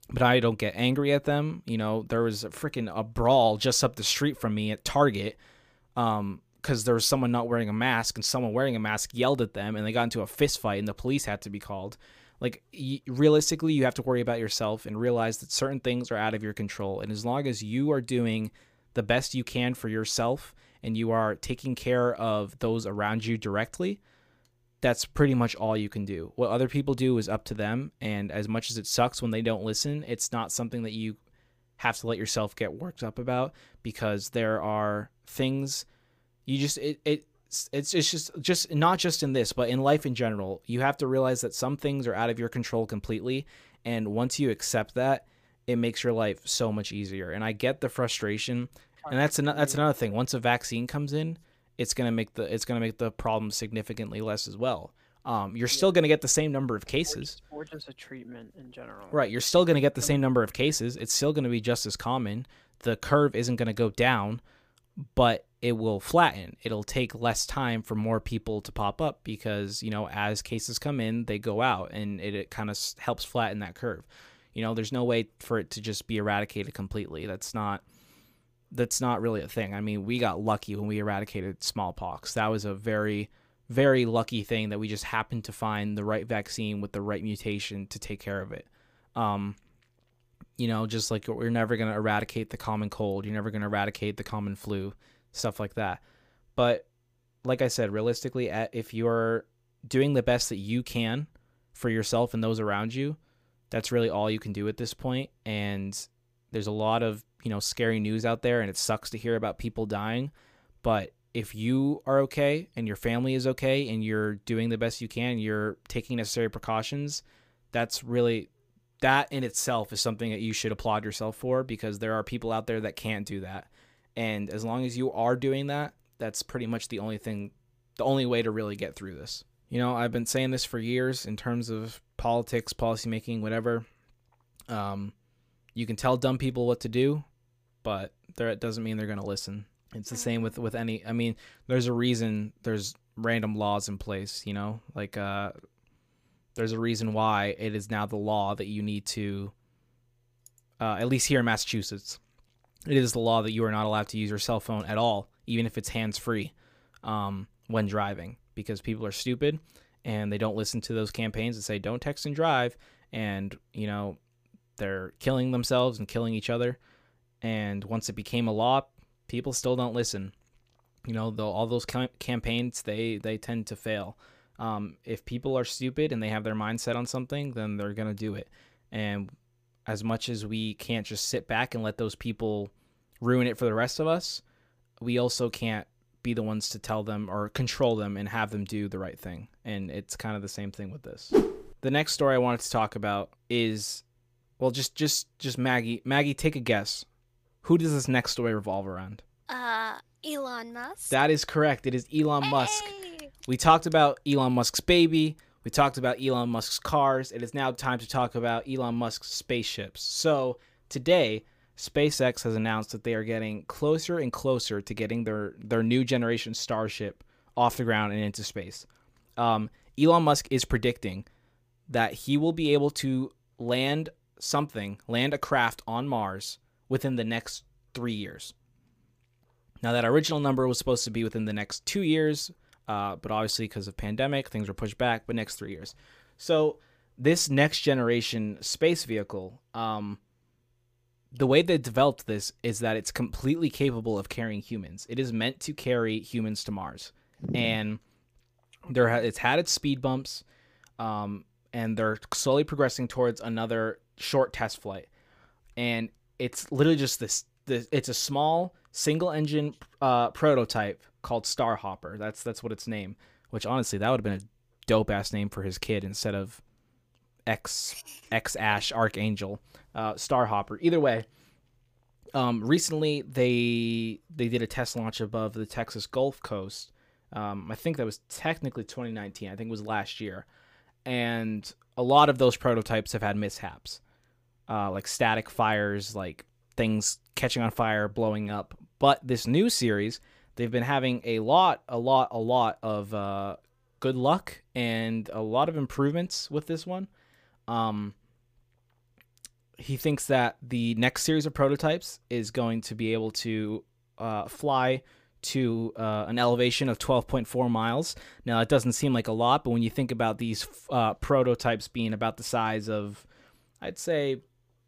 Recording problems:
none

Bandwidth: 15 kHz